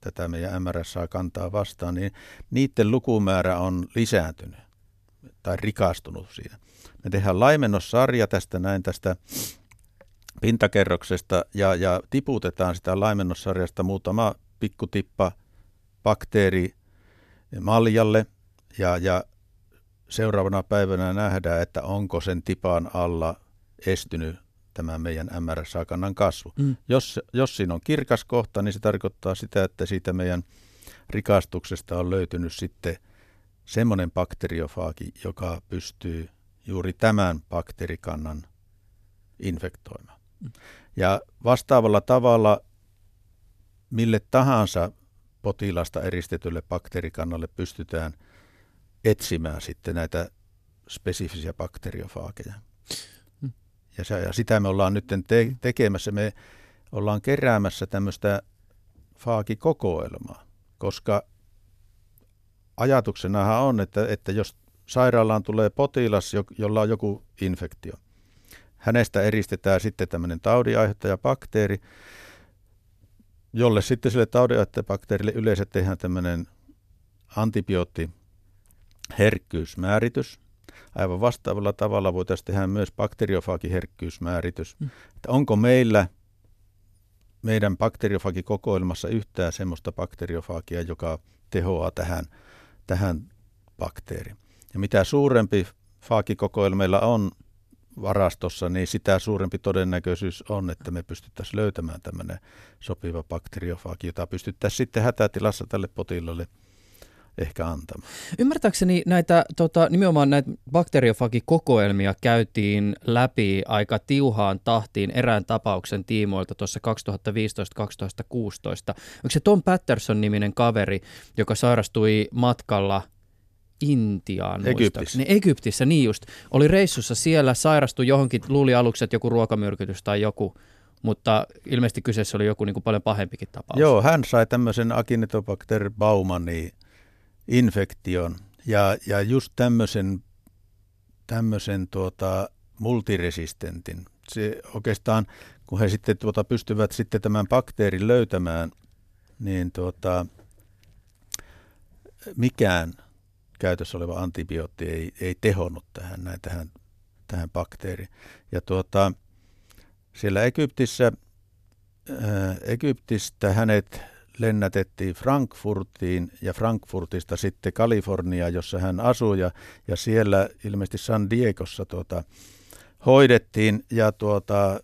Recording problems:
none

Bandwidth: 14 kHz